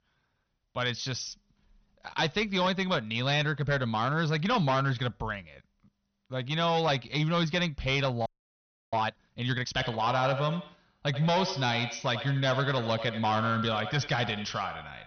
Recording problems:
echo of what is said; strong; from 9.5 s on; 90 ms later, 9 dB below the speech
high frequencies cut off; noticeable; nothing above 6 kHz
distortion; slight; 6% of the sound clipped
audio freezing; at 8.5 s for 0.5 s

